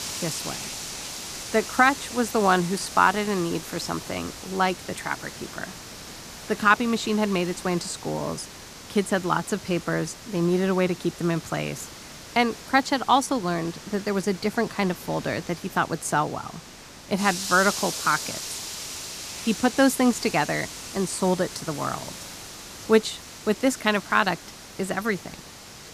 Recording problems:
hiss; noticeable; throughout; 10 dB below the speech

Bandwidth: 14.5 kHz